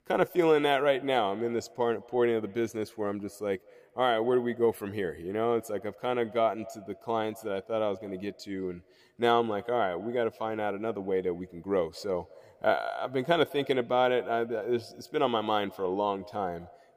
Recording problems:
echo of what is said; faint; throughout; 200 ms later, 20 dB below the speech

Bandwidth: 15 kHz